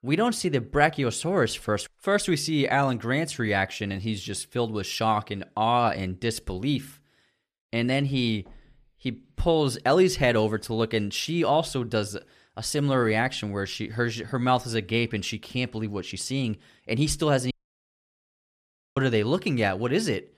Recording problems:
audio cutting out; at 18 s for 1.5 s

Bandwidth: 14.5 kHz